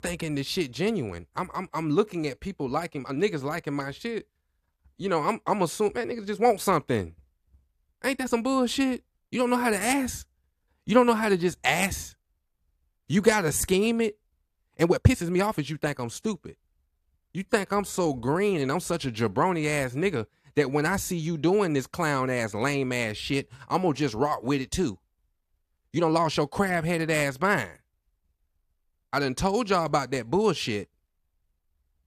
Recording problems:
uneven, jittery; strongly; from 3 to 26 s

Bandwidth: 14.5 kHz